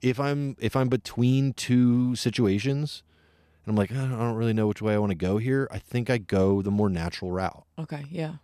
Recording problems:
none

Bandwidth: 14 kHz